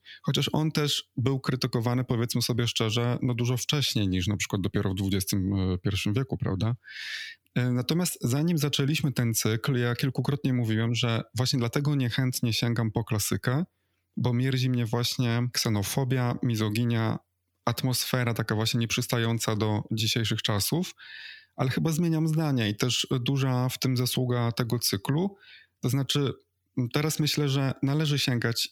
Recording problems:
squashed, flat; somewhat

